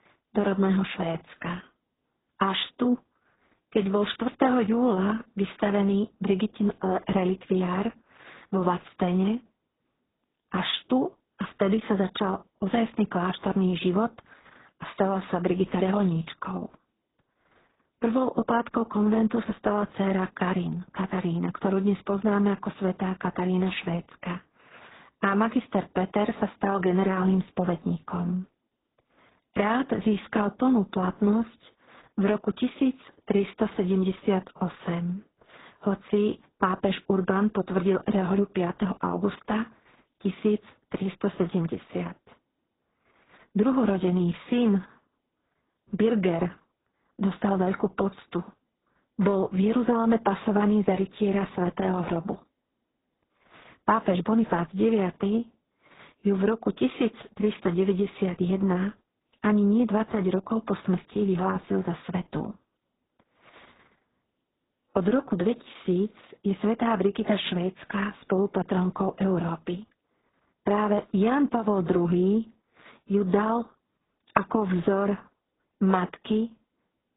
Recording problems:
garbled, watery; badly; nothing above 4 kHz

